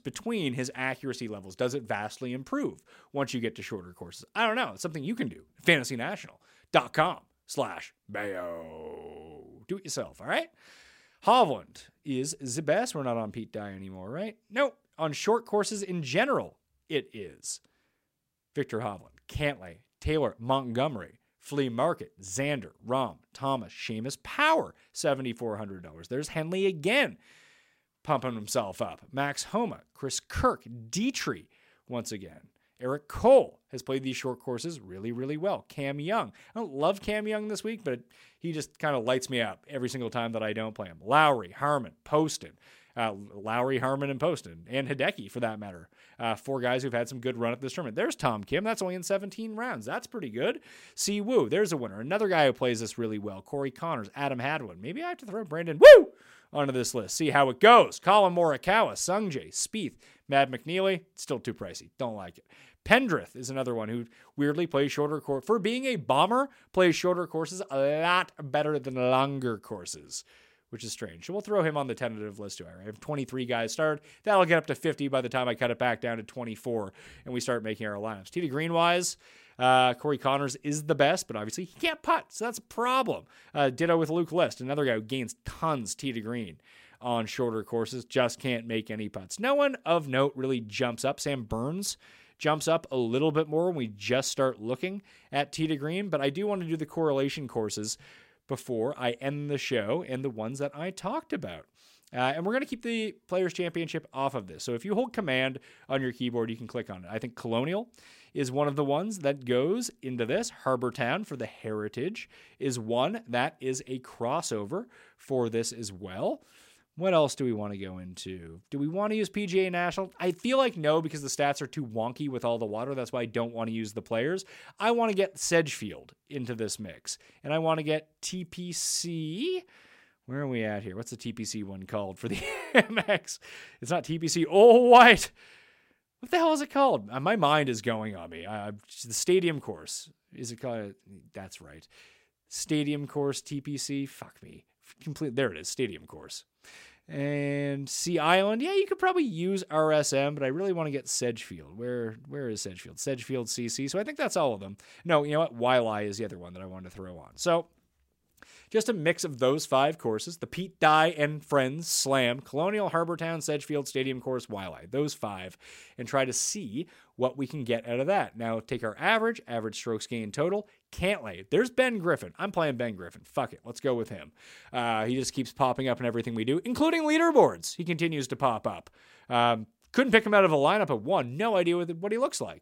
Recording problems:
none

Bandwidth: 16 kHz